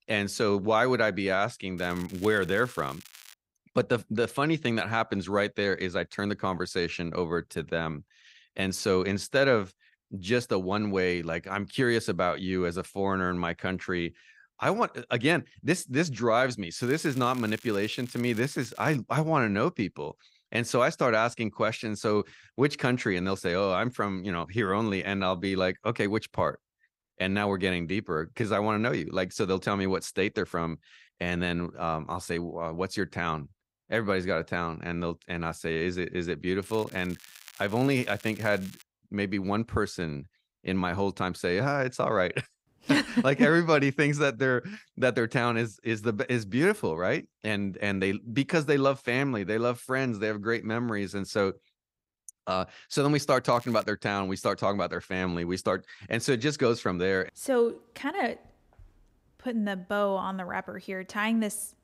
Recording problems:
crackling; faint; 4 times, first at 2 s; 20 dB below the speech

